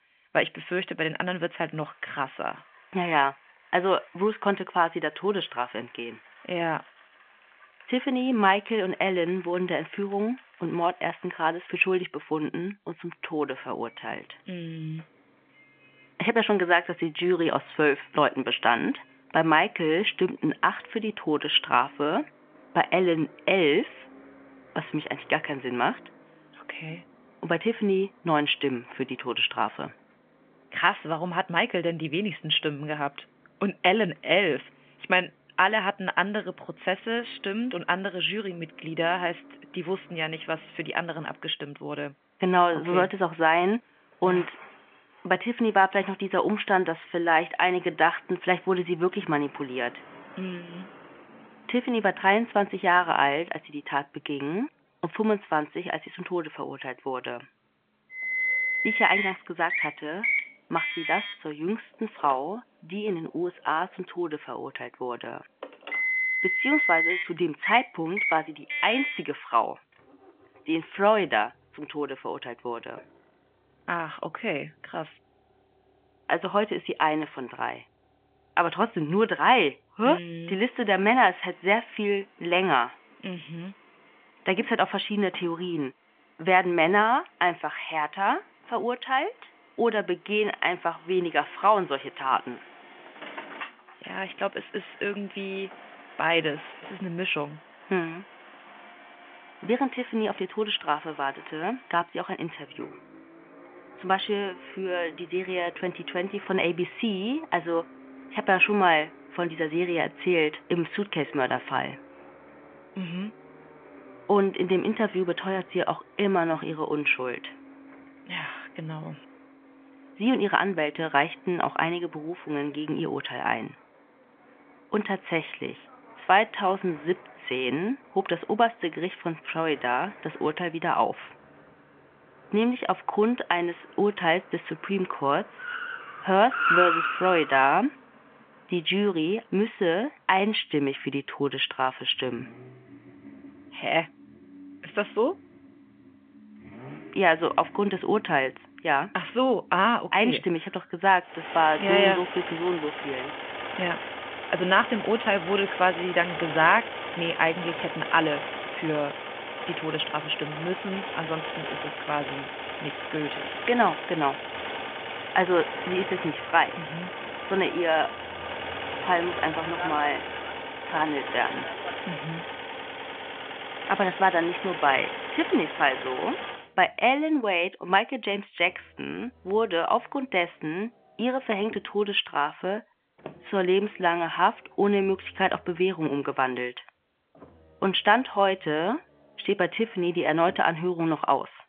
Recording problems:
phone-call audio; nothing above 3.5 kHz
traffic noise; loud; throughout; 6 dB below the speech

